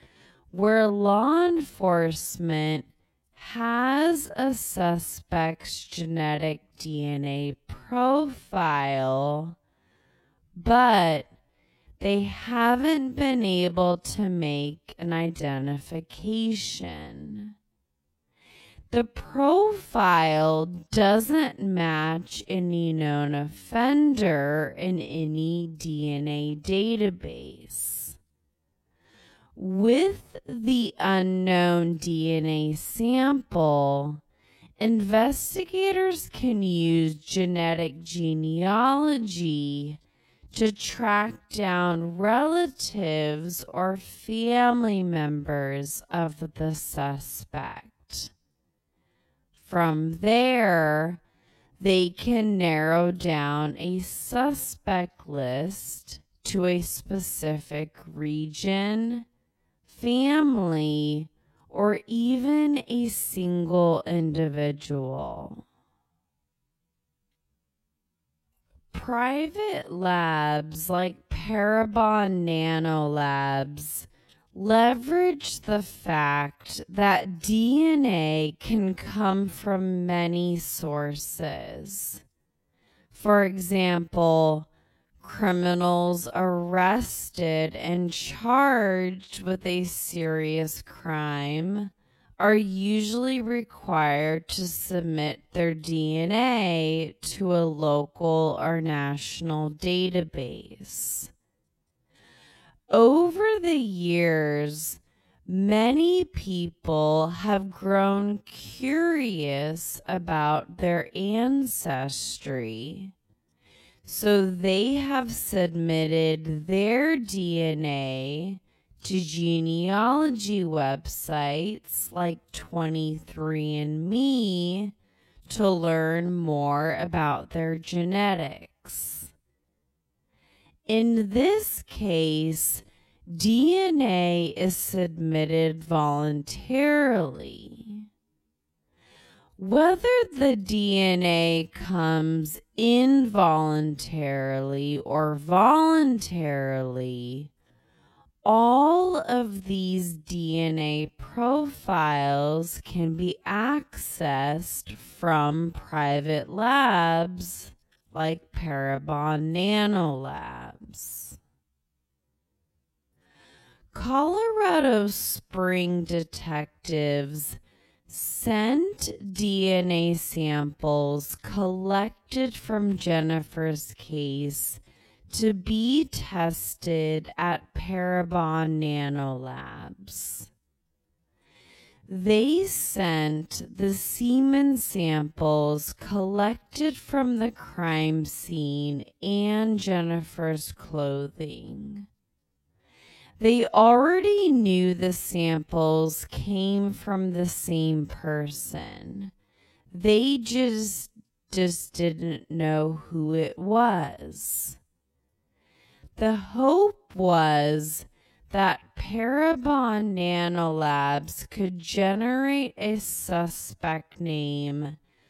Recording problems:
wrong speed, natural pitch; too slow; 0.5 times normal speed

